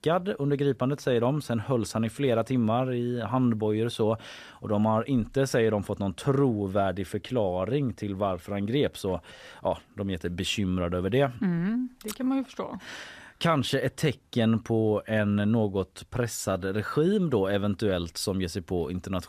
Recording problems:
none

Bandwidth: 14.5 kHz